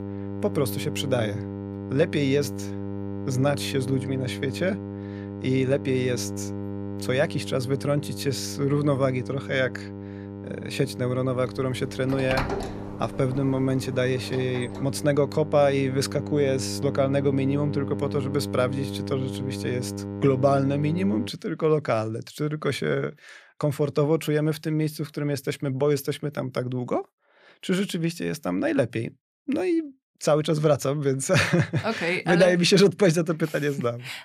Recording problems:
electrical hum; noticeable; until 21 s; 50 Hz, 10 dB below the speech
door banging; noticeable; from 12 to 15 s; peak 3 dB below the speech

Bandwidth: 14.5 kHz